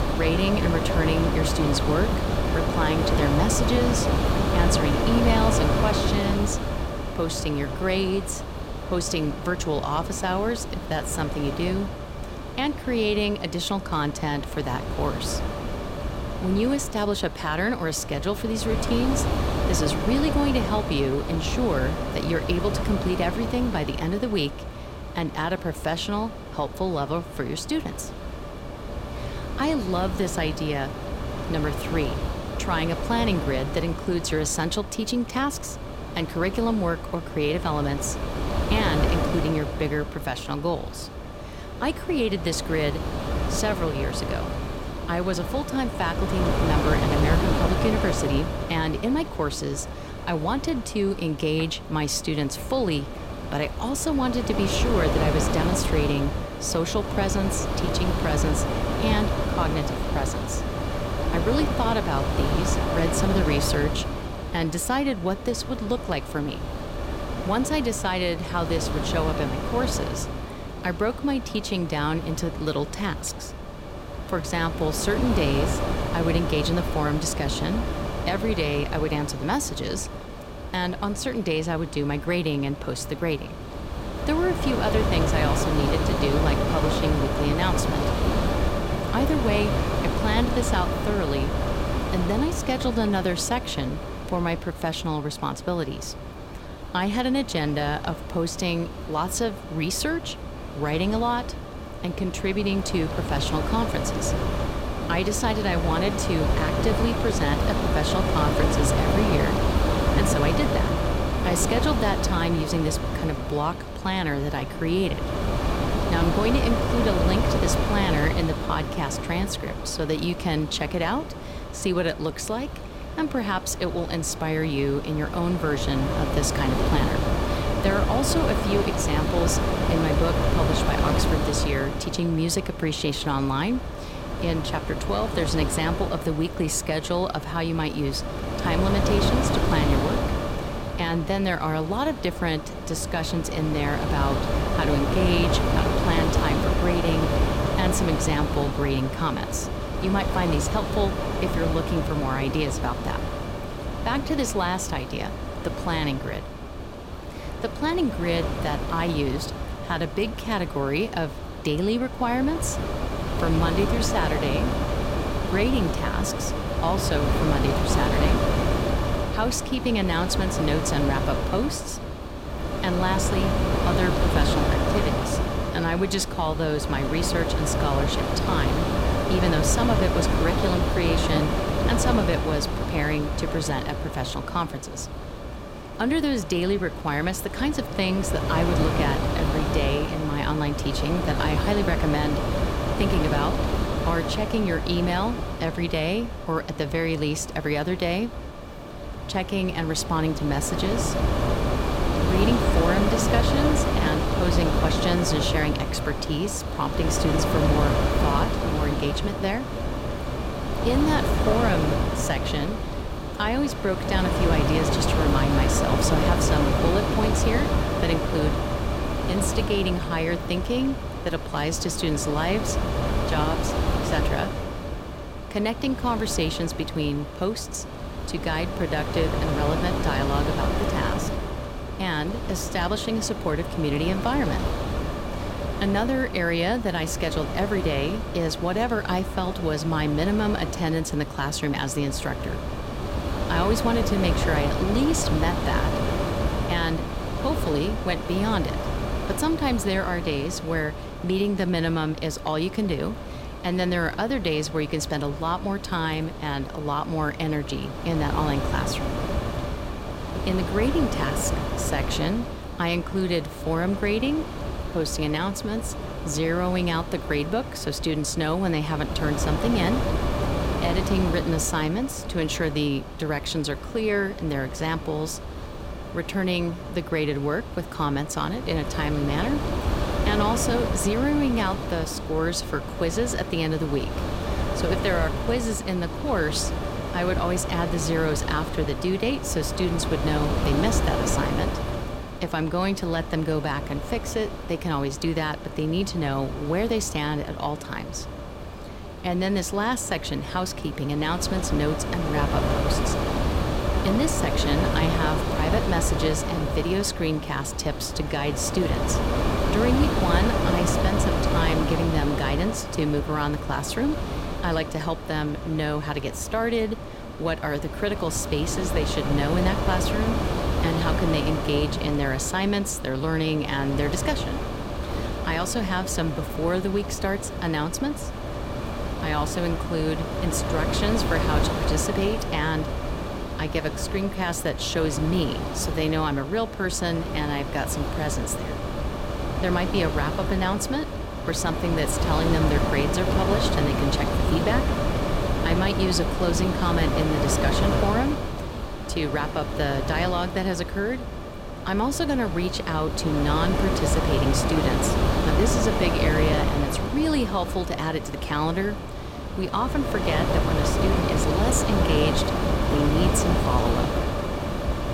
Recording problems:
wind noise on the microphone; heavy; 2 dB below the speech

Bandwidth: 16 kHz